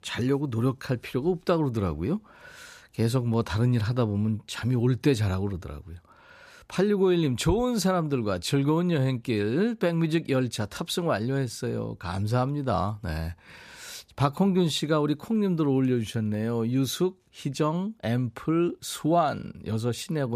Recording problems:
abrupt cut into speech; at the end

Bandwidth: 14.5 kHz